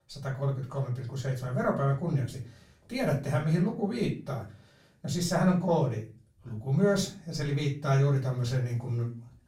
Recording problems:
off-mic speech; far
room echo; slight; dies away in 0.3 s

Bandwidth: 16 kHz